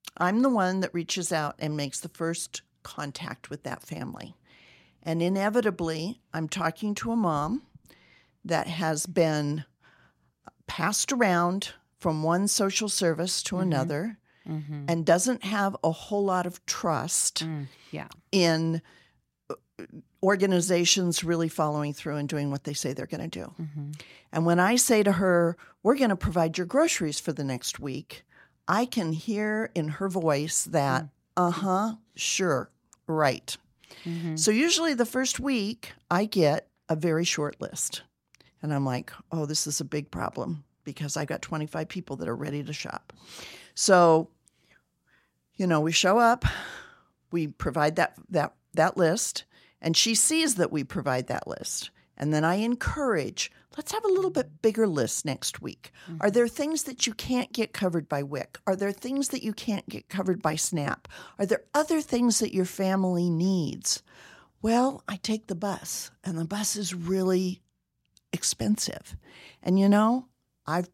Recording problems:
none

